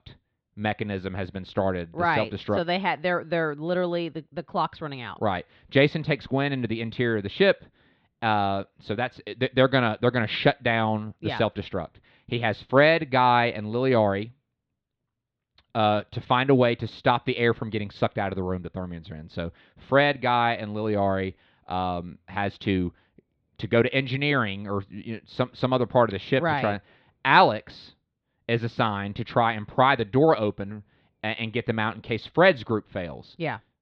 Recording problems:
muffled; slightly; fading above 3.5 kHz

